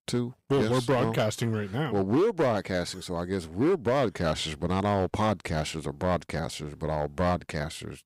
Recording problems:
distortion; slight; 7% of the sound clipped

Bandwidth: 15.5 kHz